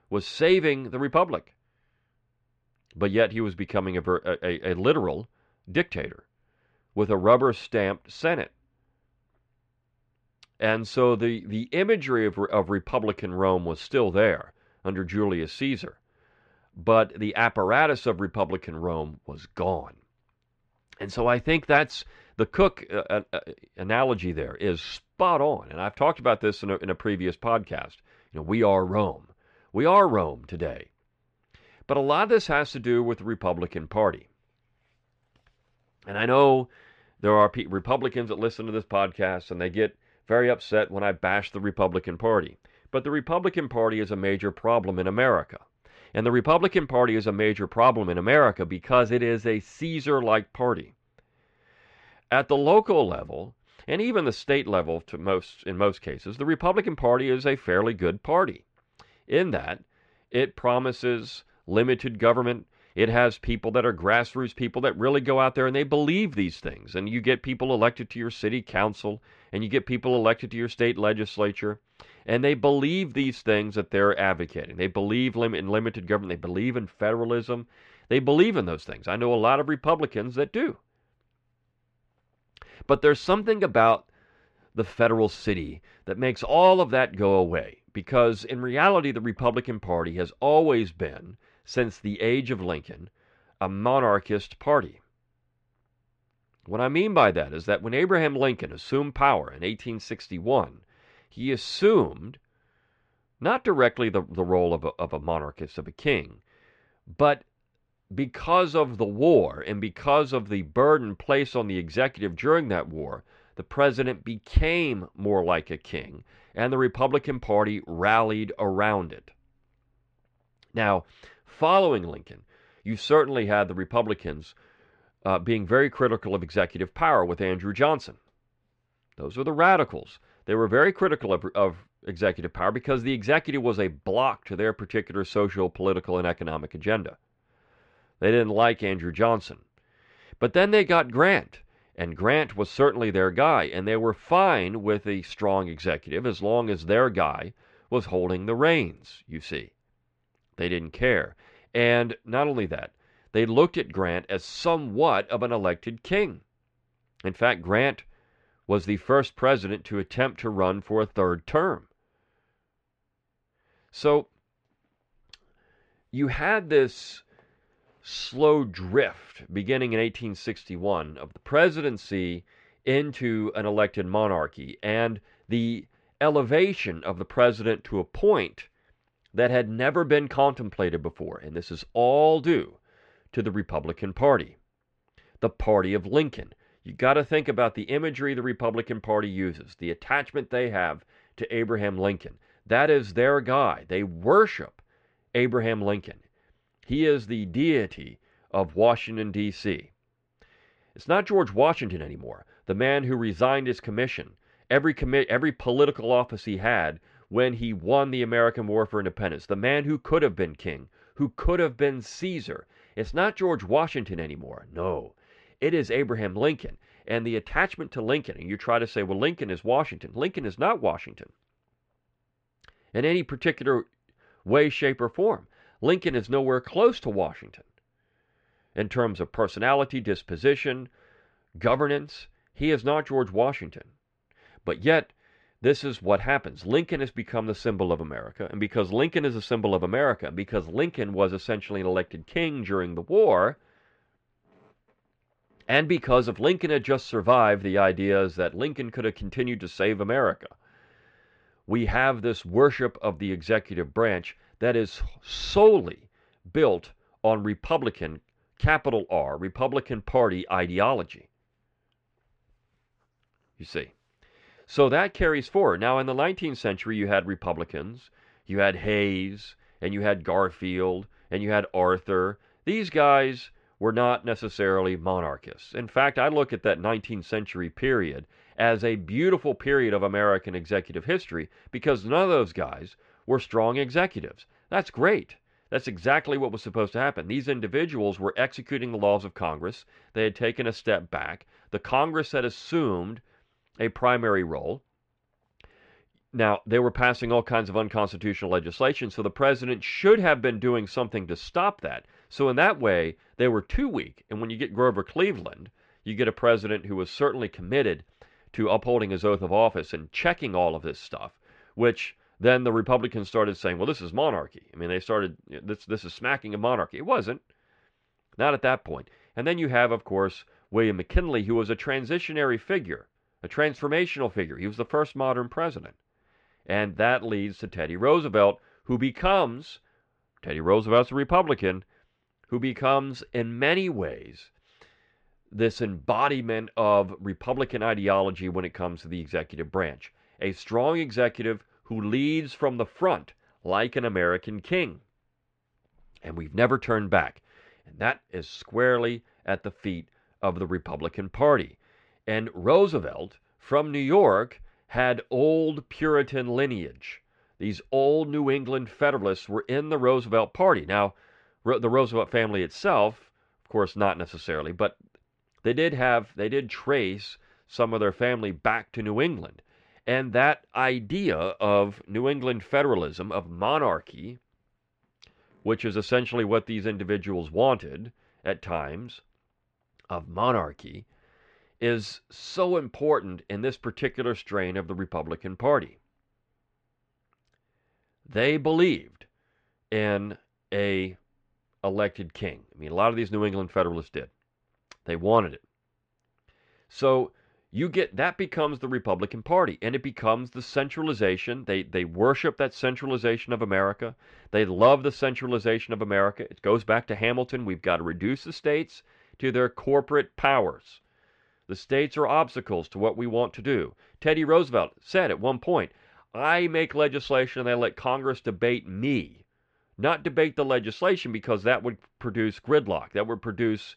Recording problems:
muffled; slightly; fading above 2.5 kHz

